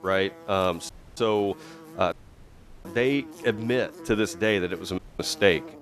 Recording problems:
electrical hum; noticeable; throughout; 50 Hz, 20 dB below the speech
audio cutting out; at 1 s, at 2 s for 0.5 s and at 5 s

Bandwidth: 13.5 kHz